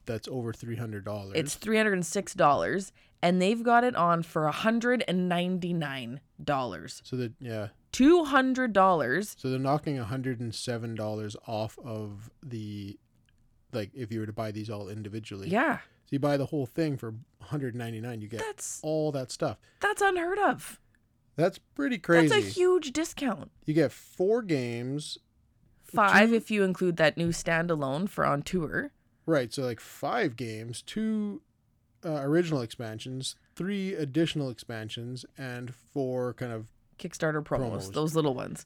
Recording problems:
none

